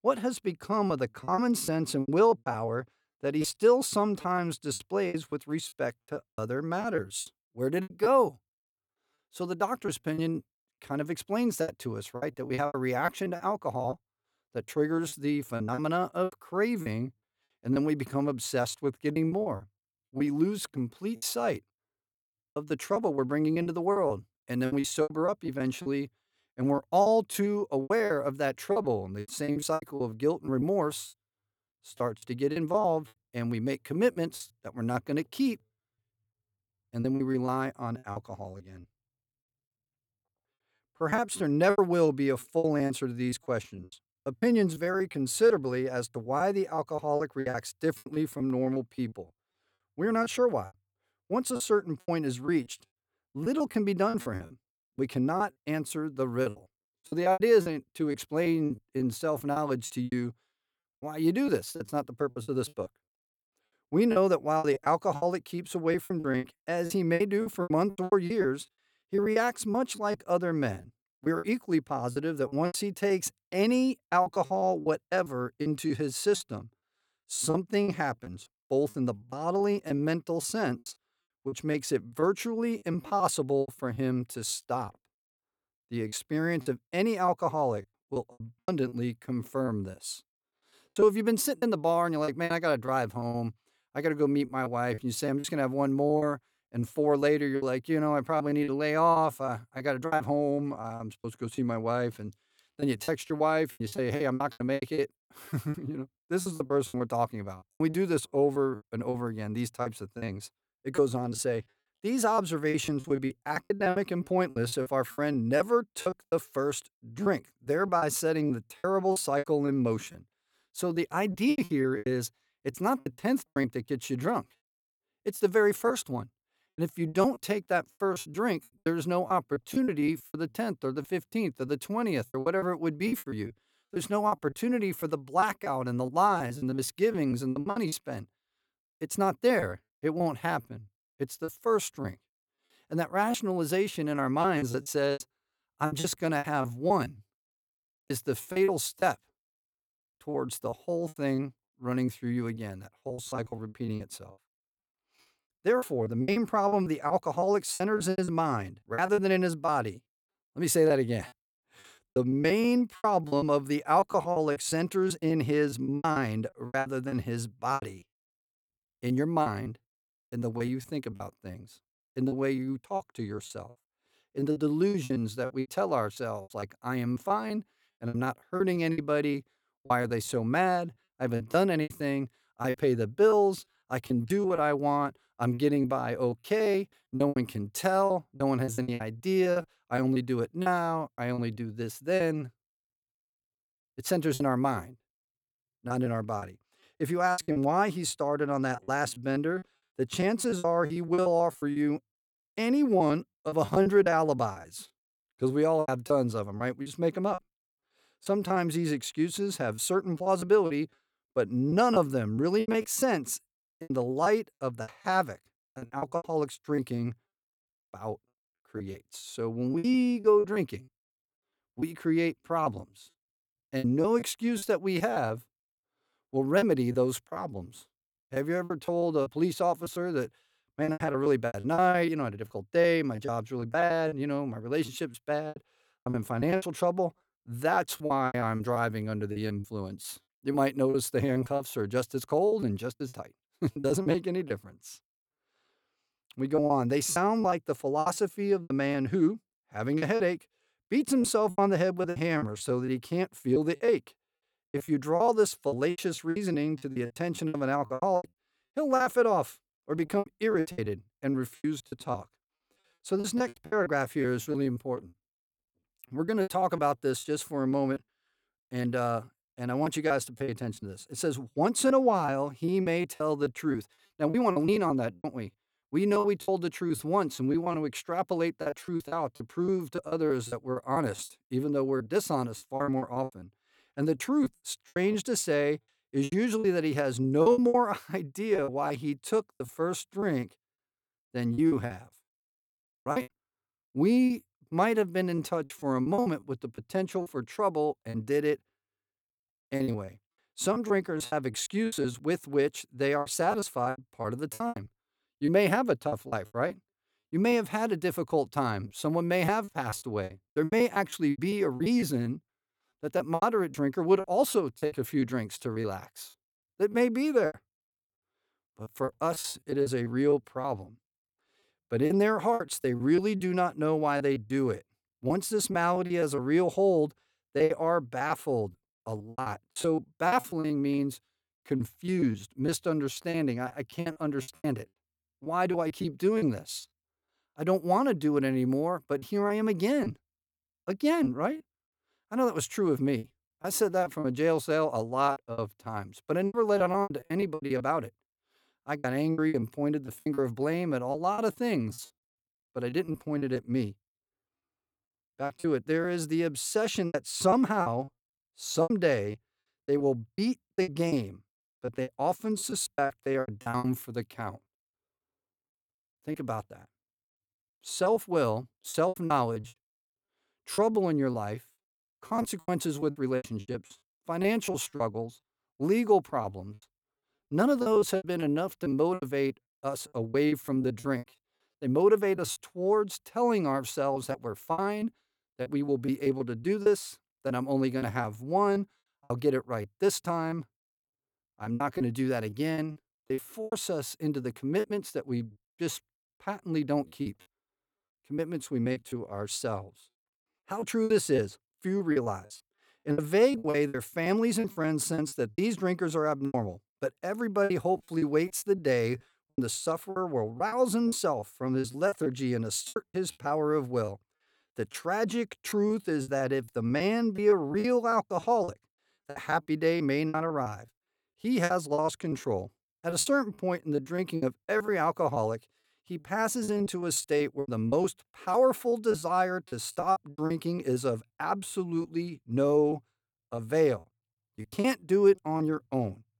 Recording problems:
choppy; very; 13% of the speech affected

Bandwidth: 18.5 kHz